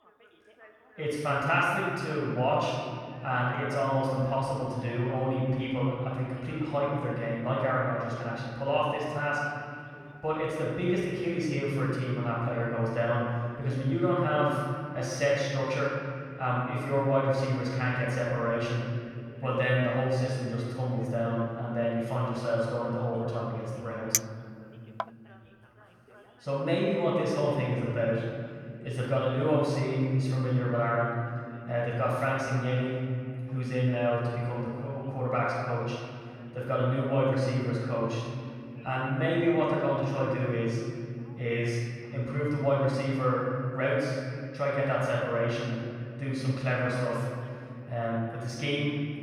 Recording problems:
room echo; strong; dies away in 2.9 s
off-mic speech; far
background chatter; faint; throughout; 2 voices, 25 dB below the speech
clattering dishes; loud; at 24 s; peak 2 dB above the speech

